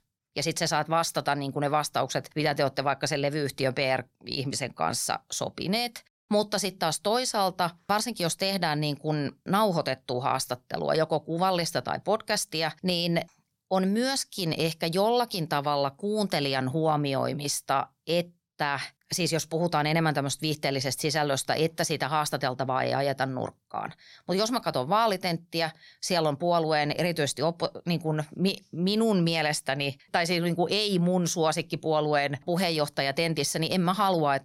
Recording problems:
none

